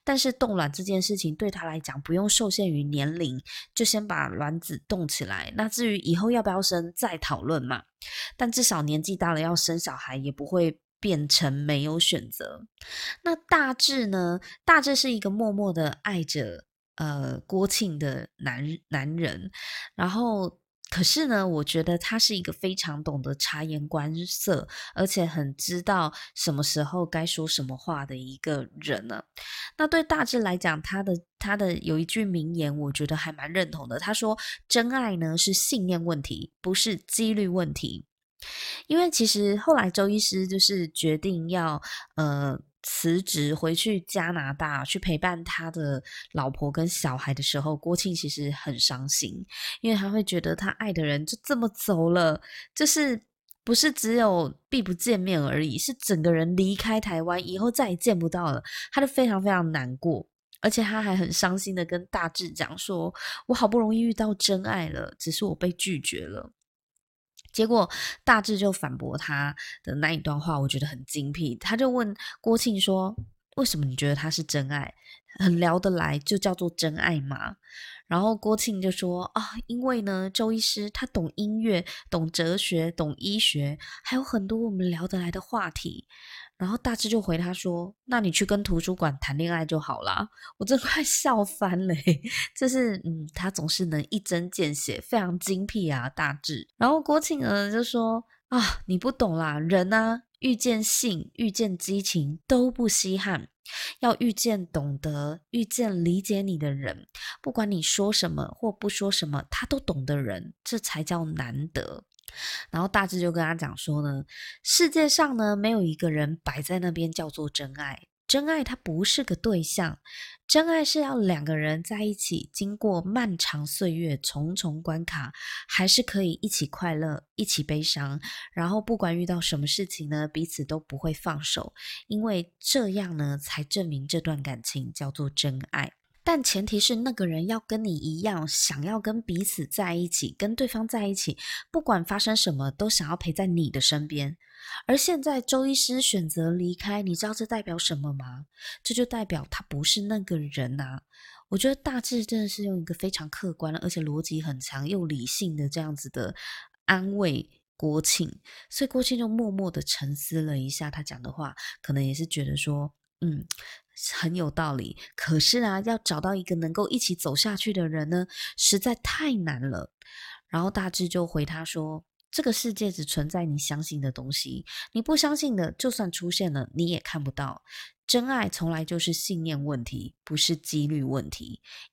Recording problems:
none

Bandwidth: 16.5 kHz